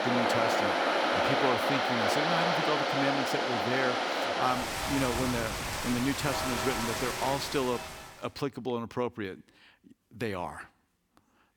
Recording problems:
rain or running water; very loud; until 8 s; 4 dB above the speech

